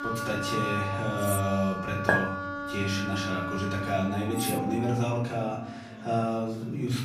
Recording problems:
off-mic speech; far
room echo; noticeable; dies away in 0.6 s
background music; loud; throughout; 4 dB below the speech
chatter from many people; faint; throughout; 20 dB below the speech
clattering dishes; noticeable; at 1 s and at 4.5 s; peak 5 dB below the speech
clattering dishes; loud; at 2 s; peak 4 dB above the speech

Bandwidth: 15 kHz